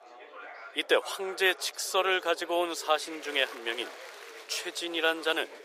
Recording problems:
thin; very; fading below 450 Hz
chatter from many people; noticeable; throughout; 15 dB below the speech

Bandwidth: 15 kHz